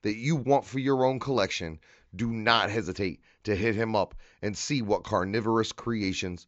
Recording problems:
high frequencies cut off; noticeable; nothing above 7.5 kHz

